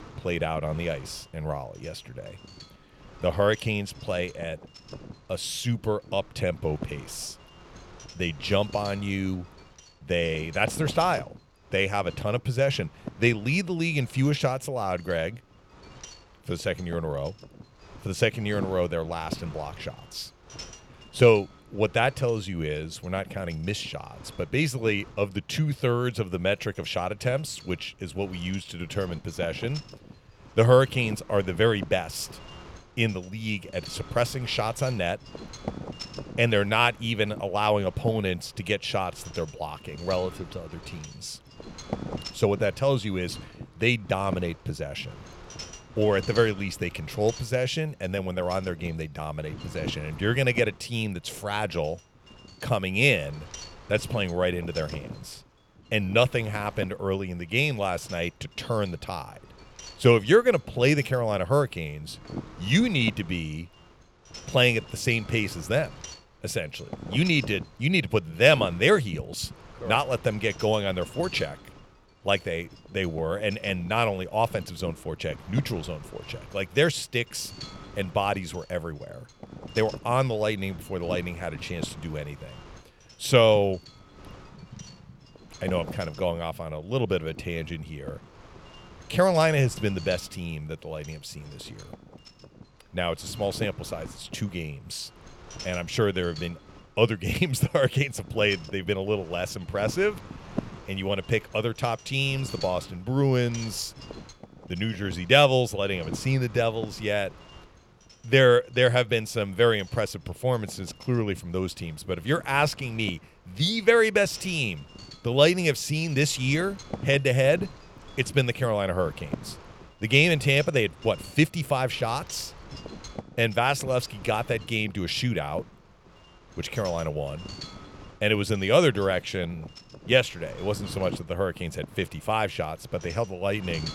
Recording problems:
wind noise on the microphone; occasional gusts; 20 dB below the speech

